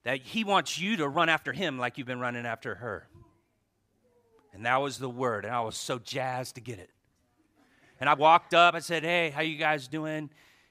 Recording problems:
uneven, jittery; strongly; from 0.5 to 10 s

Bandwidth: 15 kHz